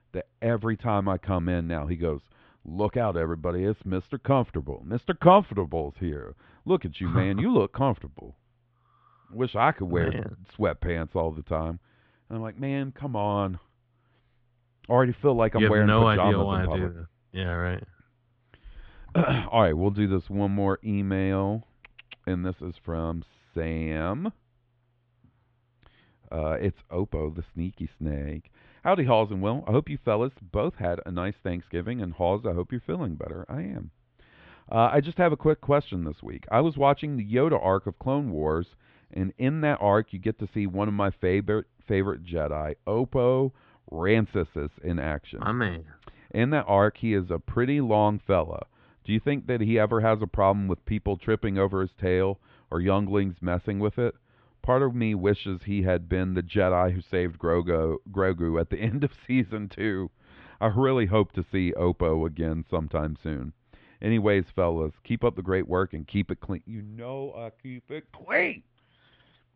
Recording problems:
muffled; very; fading above 3.5 kHz

